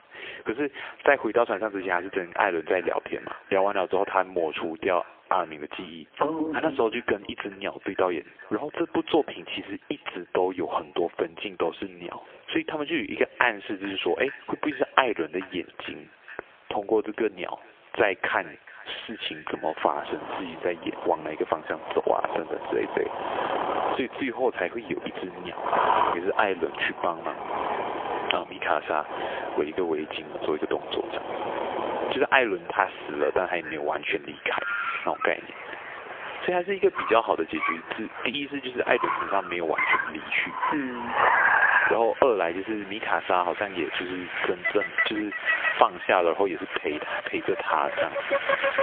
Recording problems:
phone-call audio; poor line; nothing above 3.5 kHz
echo of what is said; faint; throughout; 440 ms later, 20 dB below the speech
squashed, flat; somewhat, background pumping
traffic noise; loud; from 20 s on; 1 dB below the speech

